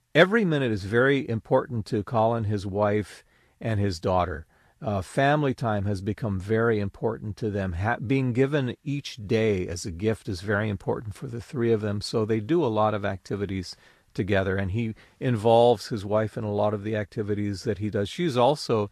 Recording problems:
garbled, watery; slightly; nothing above 13 kHz

